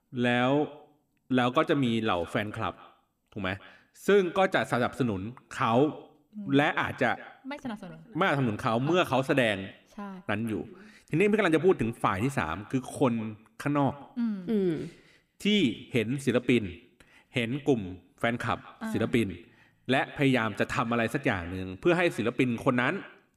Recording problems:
echo of what is said; faint; throughout; 160 ms later, 20 dB below the speech

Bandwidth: 15 kHz